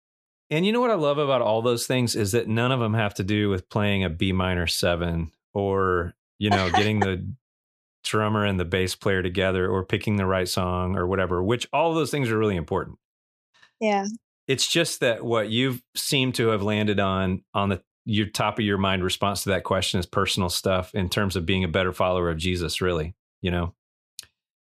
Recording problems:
none

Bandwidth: 14.5 kHz